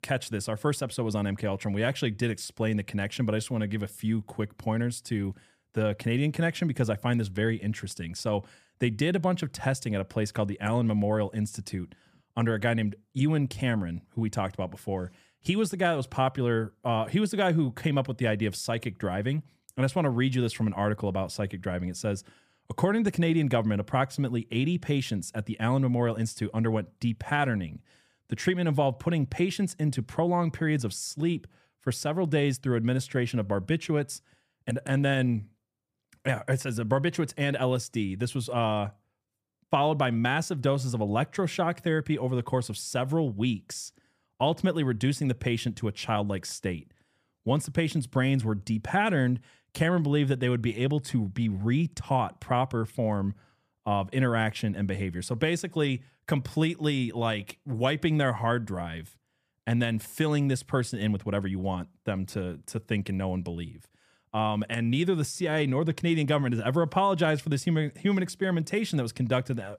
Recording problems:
none

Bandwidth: 15 kHz